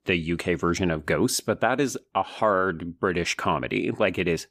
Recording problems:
none

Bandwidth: 15 kHz